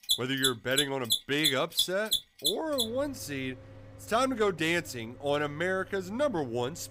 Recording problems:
machinery noise; very loud; throughout; 1 dB above the speech

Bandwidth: 15.5 kHz